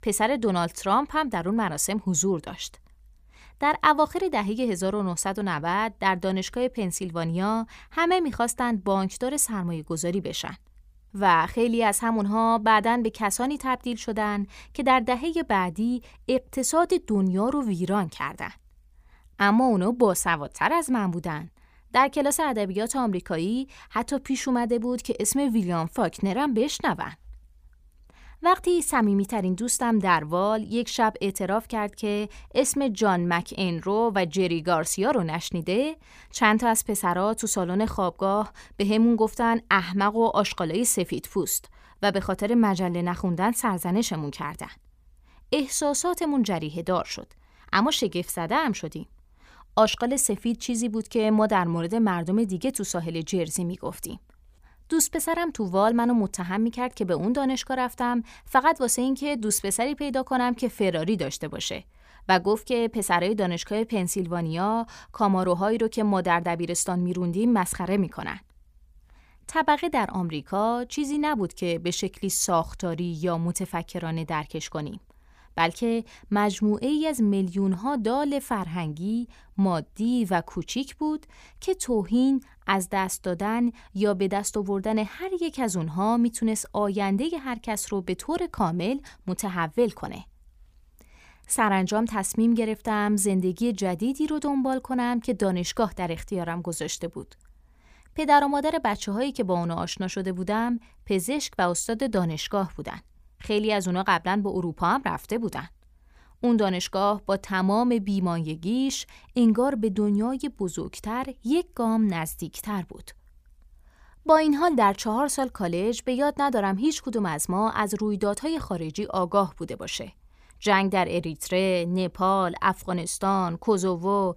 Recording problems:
none

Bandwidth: 15 kHz